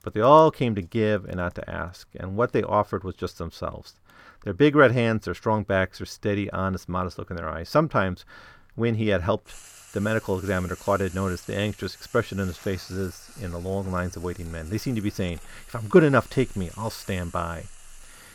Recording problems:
household noises; faint; throughout; 20 dB below the speech

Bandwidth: 18 kHz